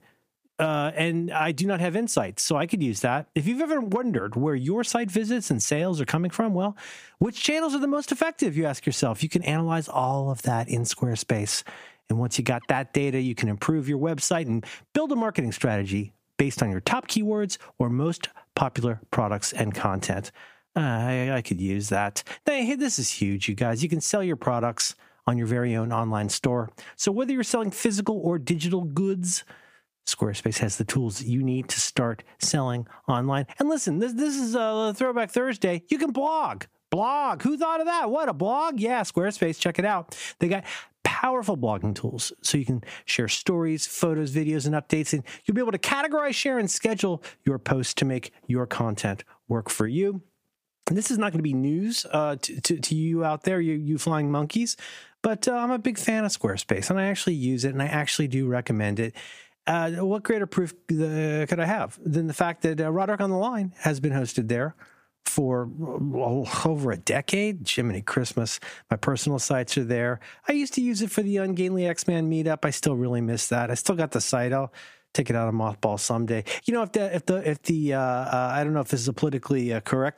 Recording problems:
squashed, flat; somewhat

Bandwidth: 15 kHz